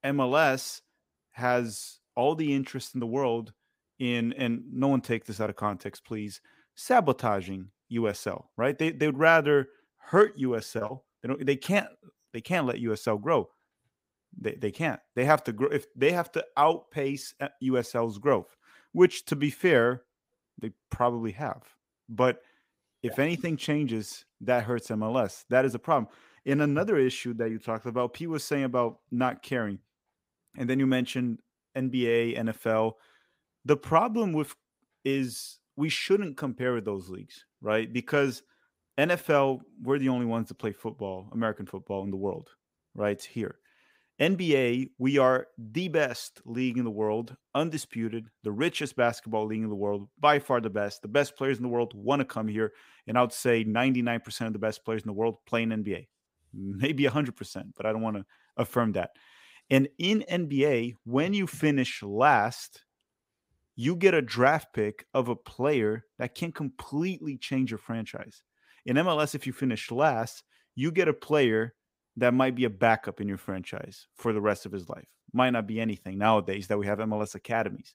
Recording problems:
none

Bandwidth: 15.5 kHz